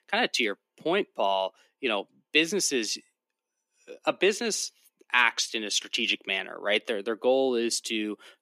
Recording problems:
thin; somewhat; fading below 300 Hz

